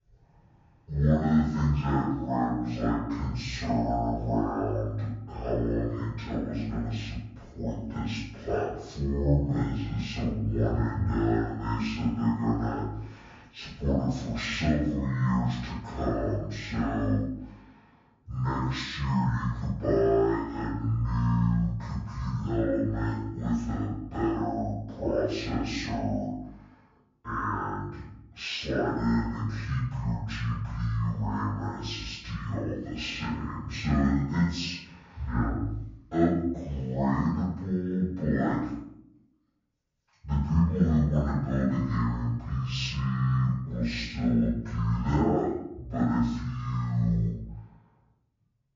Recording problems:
off-mic speech; far
wrong speed and pitch; too slow and too low; 0.5 times normal speed
room echo; noticeable; dies away in 0.8 s

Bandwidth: 7.5 kHz